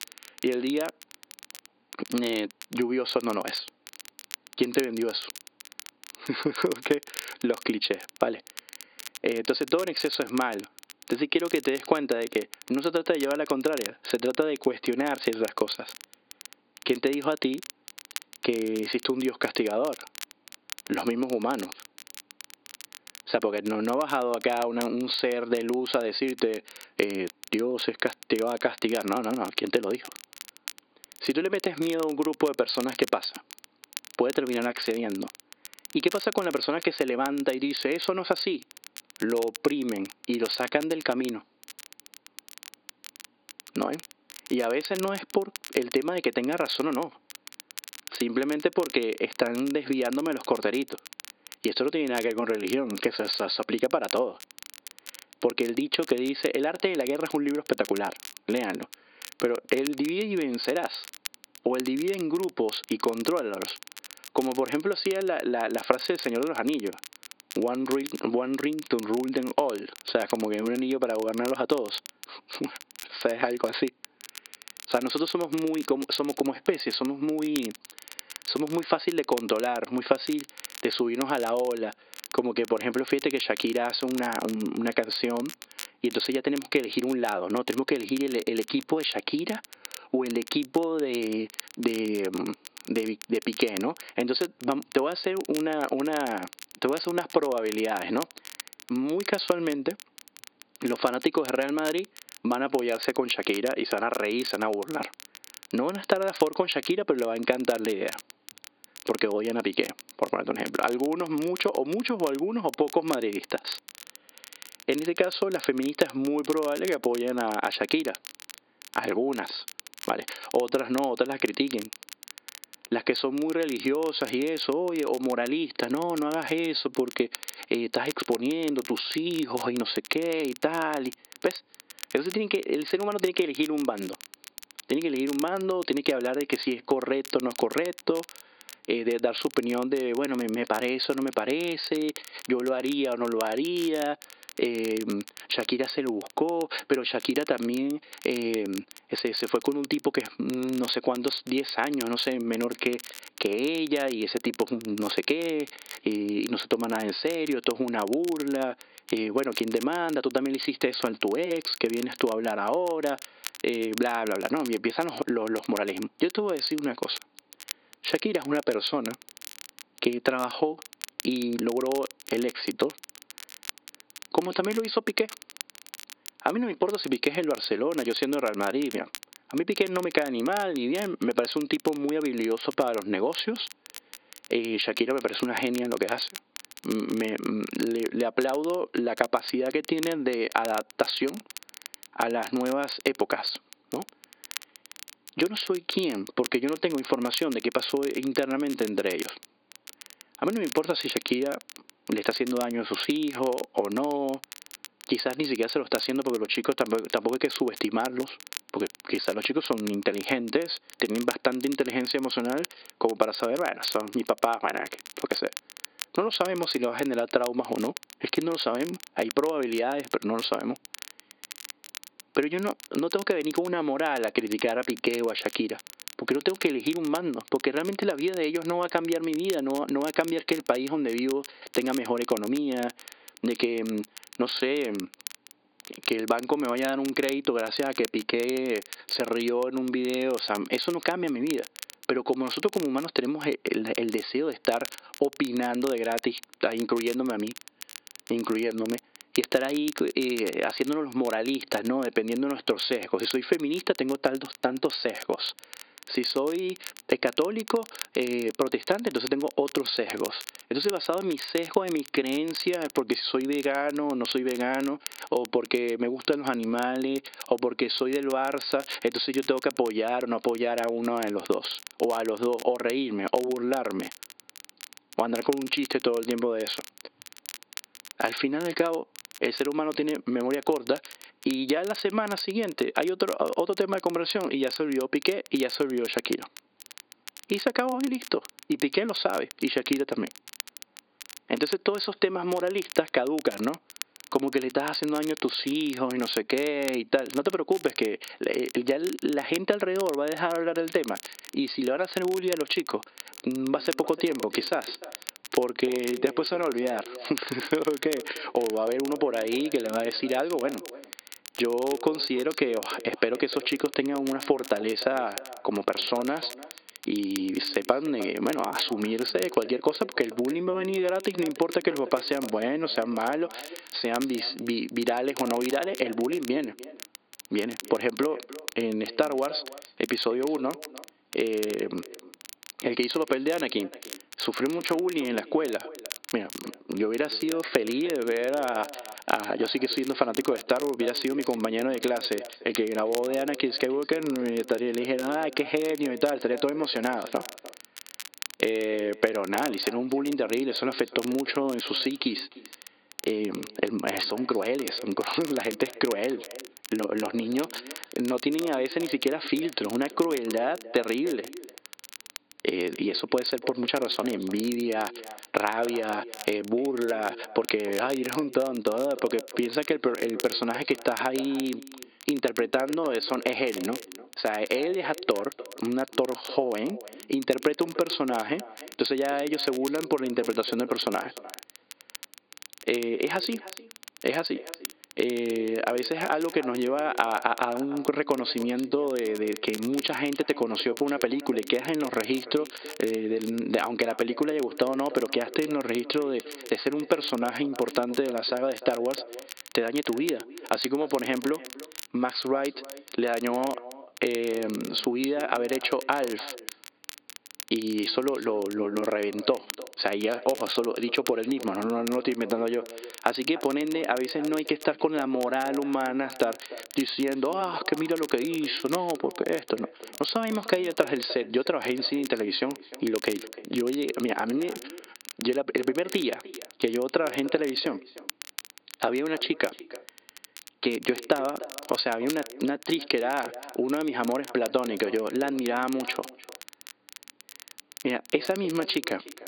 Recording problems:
high frequencies cut off; severe; nothing above 5 kHz
echo of what is said; noticeable; from 5:03 on; 300 ms later, 15 dB below the speech
thin; very slightly; fading below 300 Hz
squashed, flat; somewhat
crackle, like an old record; noticeable; 15 dB below the speech

